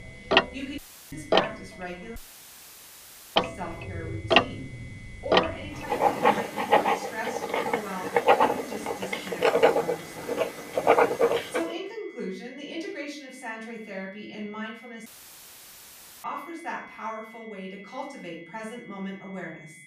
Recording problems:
off-mic speech; far
room echo; noticeable; dies away in 0.6 s
household noises; very loud; until 12 s; 15 dB above the speech
high-pitched whine; noticeable; throughout; 2 kHz, 10 dB below the speech
audio cutting out; filled with static; at 1 s, at 2 s for 1 s and at 15 s for 1 s

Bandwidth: 15 kHz